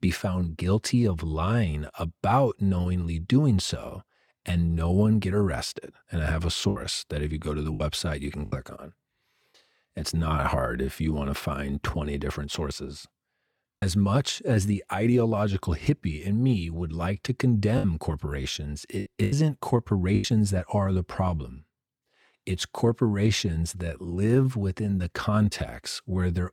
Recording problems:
choppy; very; from 6.5 to 8.5 s, at 14 s and from 18 to 20 s; 7% of the speech affected

